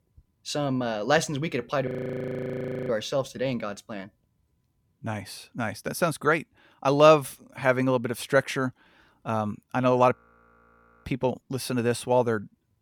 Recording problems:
audio freezing; at 2 s for 1 s and at 10 s for 1 s

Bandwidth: 19 kHz